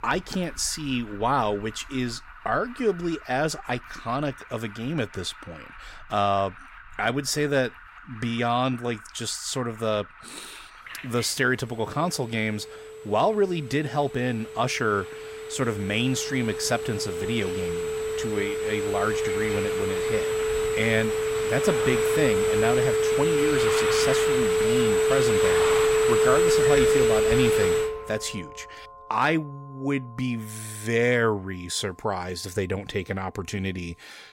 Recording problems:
alarms or sirens; very loud; throughout; 4 dB above the speech

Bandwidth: 16 kHz